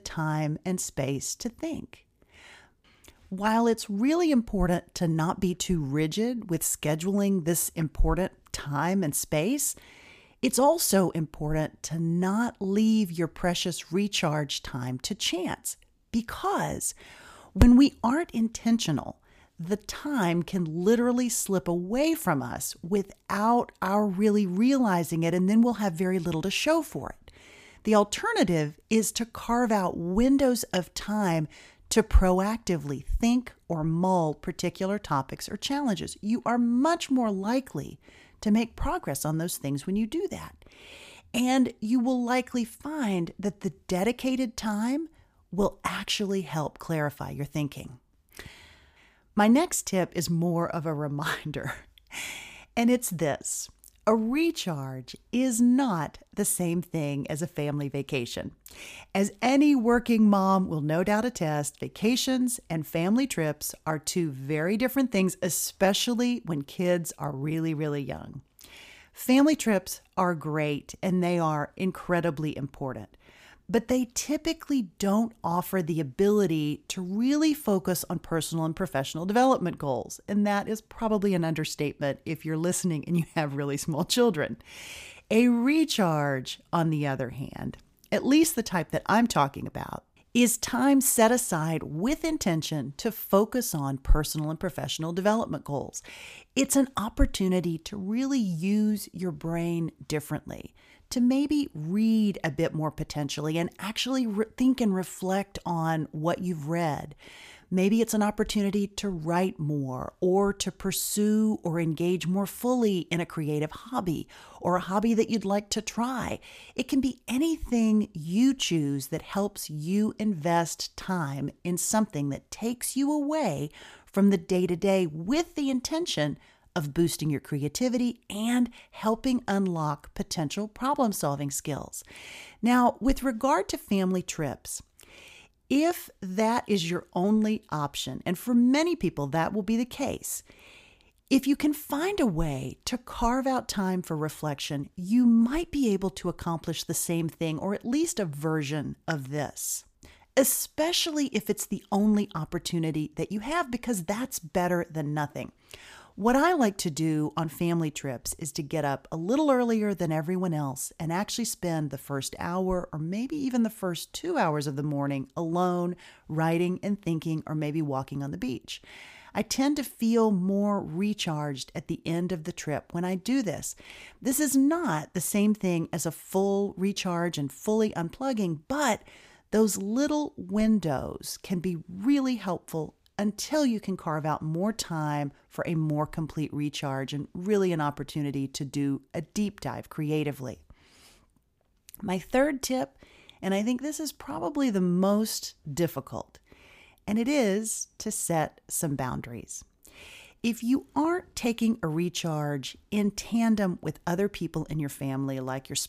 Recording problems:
none

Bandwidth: 15 kHz